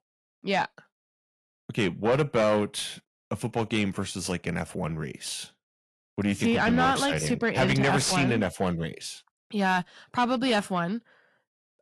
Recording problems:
distortion; slight; 10 dB below the speech
garbled, watery; slightly; nothing above 11 kHz

